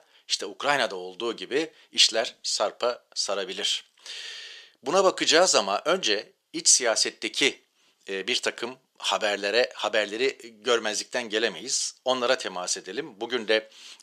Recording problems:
thin; very; fading below 450 Hz

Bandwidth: 14.5 kHz